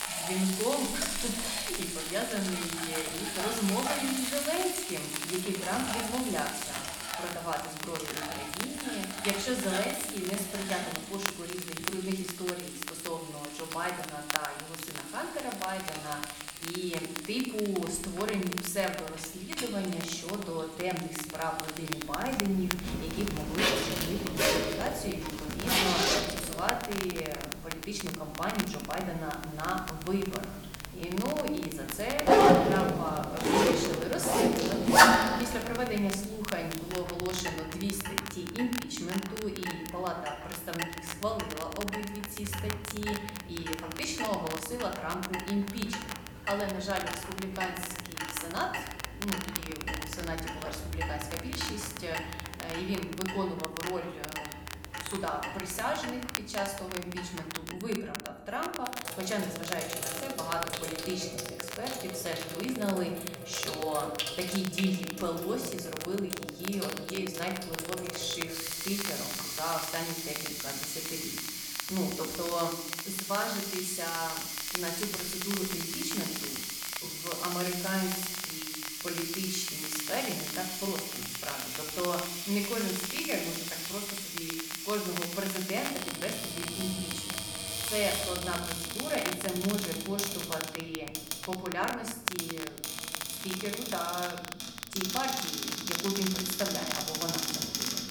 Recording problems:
room echo; slight; dies away in 0.7 s
off-mic speech; somewhat distant
household noises; very loud; throughout; 2 dB above the speech
crackle, like an old record; loud; 6 dB below the speech
uneven, jittery; slightly; from 25 to 55 s

